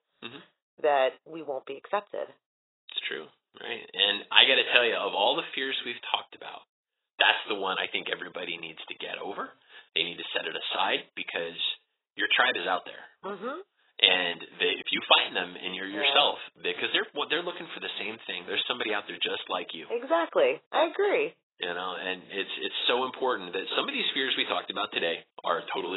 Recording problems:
garbled, watery; badly; nothing above 4 kHz
thin; somewhat; fading below 500 Hz
abrupt cut into speech; at the end

